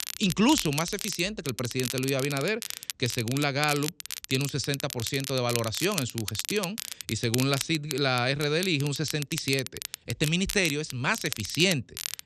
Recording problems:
crackle, like an old record; loud; 8 dB below the speech

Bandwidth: 13 kHz